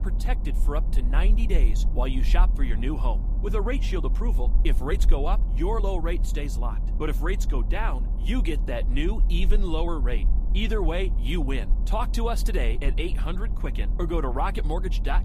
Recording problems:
low rumble; noticeable; throughout; 15 dB below the speech

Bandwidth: 15 kHz